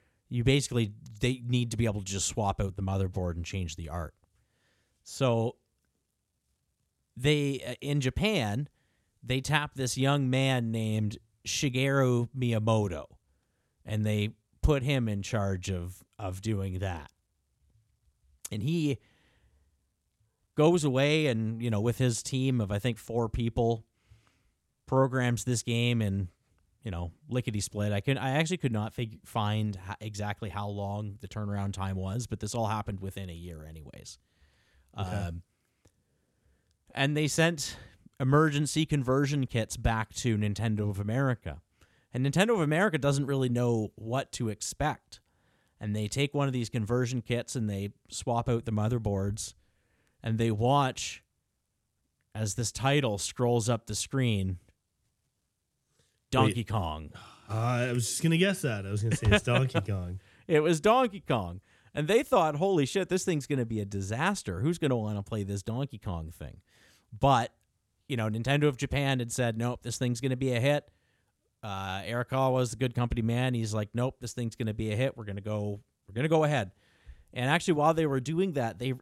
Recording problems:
none

